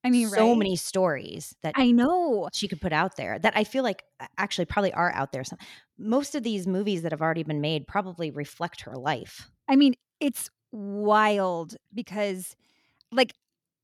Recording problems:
none

